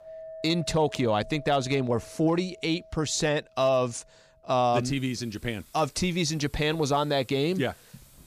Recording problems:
household noises; faint; throughout; 20 dB below the speech

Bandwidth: 15 kHz